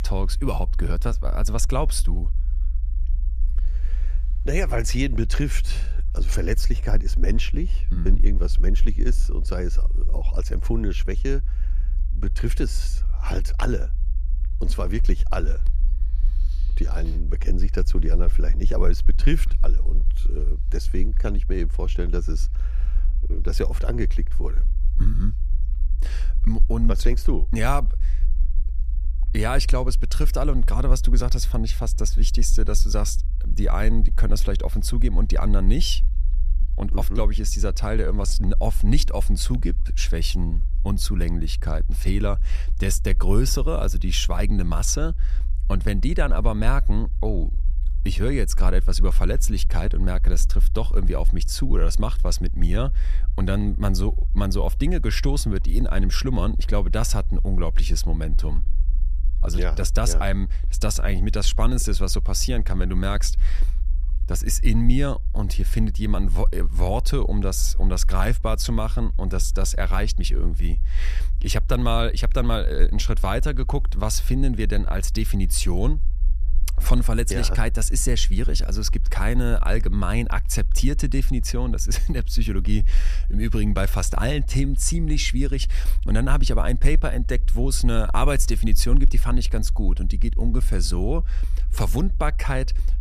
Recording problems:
low rumble; faint; throughout; 20 dB below the speech

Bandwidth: 14.5 kHz